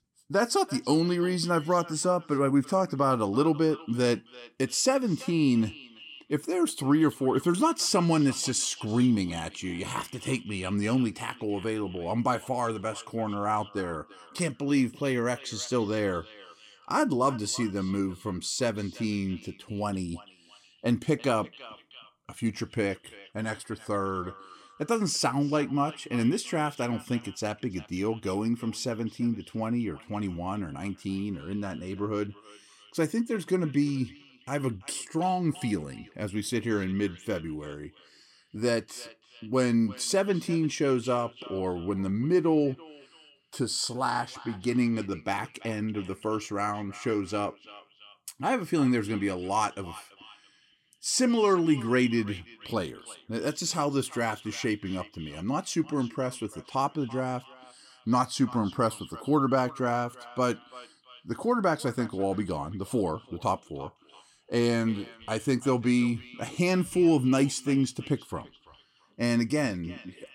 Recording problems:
echo of what is said; faint; throughout; 340 ms later, 20 dB below the speech

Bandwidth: 16 kHz